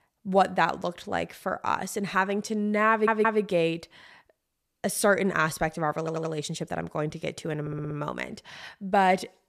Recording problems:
audio stuttering; at 3 s, at 6 s and at 7.5 s

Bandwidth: 14.5 kHz